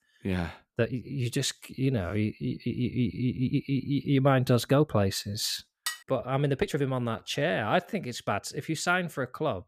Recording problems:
uneven, jittery; strongly; from 1 to 8.5 s
clattering dishes; noticeable; at 6 s; peak 6 dB below the speech

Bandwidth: 14.5 kHz